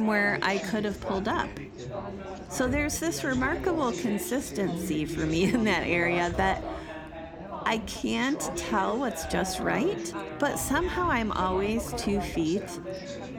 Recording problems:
background chatter; loud; throughout; 4 voices, 7 dB below the speech
abrupt cut into speech; at the start

